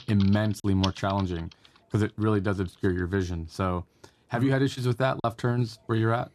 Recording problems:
household noises; noticeable; throughout; 15 dB below the speech
choppy; occasionally; at 0.5 s and at 5 s; 2% of the speech affected

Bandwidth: 13.5 kHz